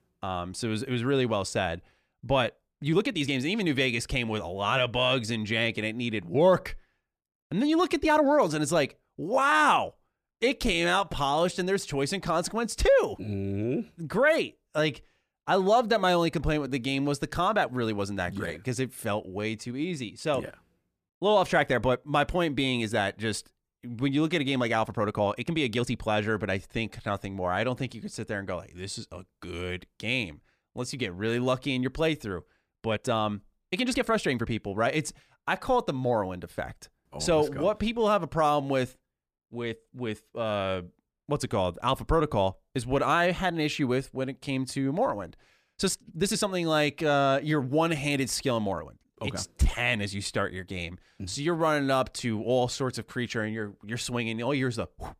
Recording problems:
uneven, jittery; strongly; from 2.5 to 50 s

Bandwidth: 14.5 kHz